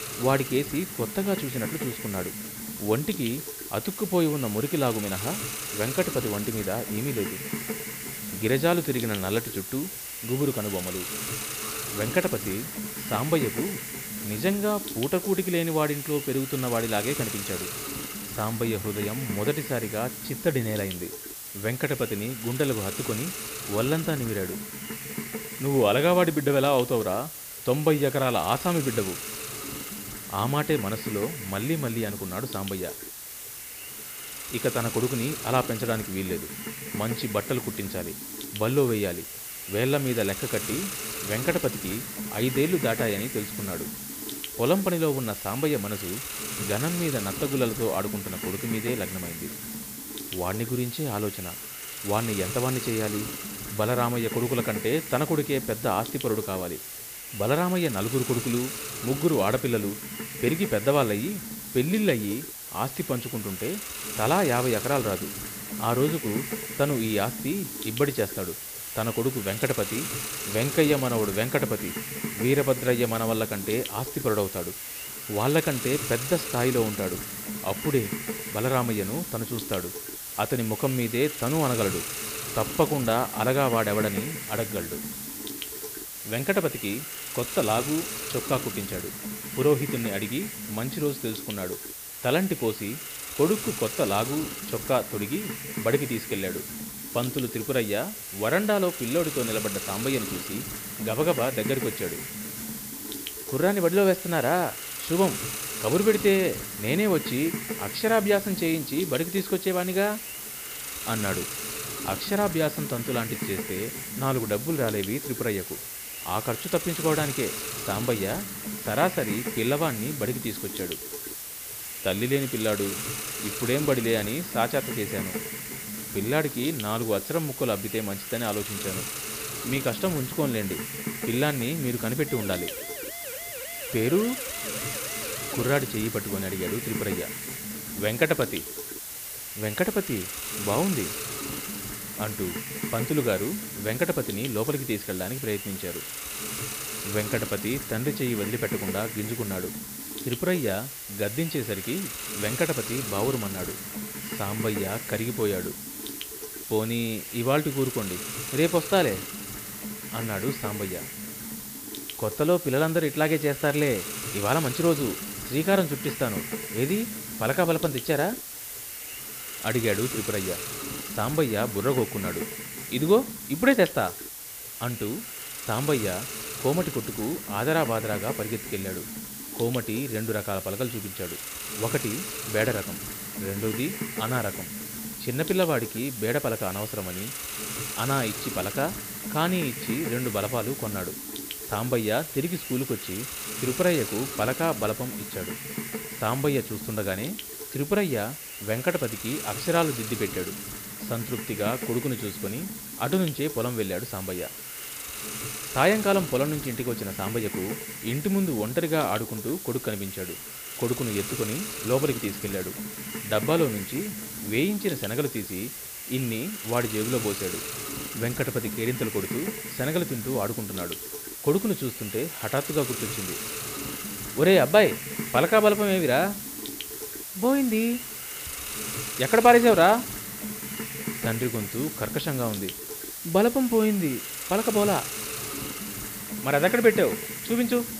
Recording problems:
high frequencies cut off; noticeable; nothing above 5.5 kHz
hiss; loud; throughout; 6 dB below the speech
alarm; faint; at 12 s; peak 20 dB below the speech
siren; faint; from 2:12 to 2:16; peak 10 dB below the speech

